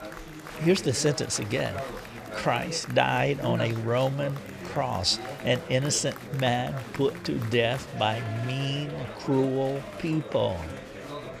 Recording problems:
chatter from many people; noticeable; throughout; 10 dB below the speech

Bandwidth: 14.5 kHz